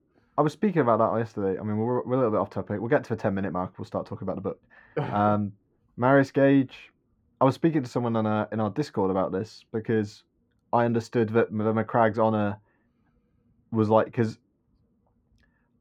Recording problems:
muffled; very; fading above 3 kHz

